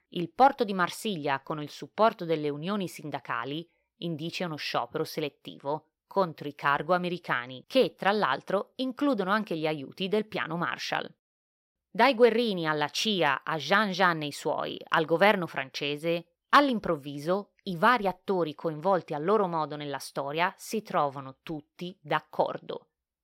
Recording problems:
none

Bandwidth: 16 kHz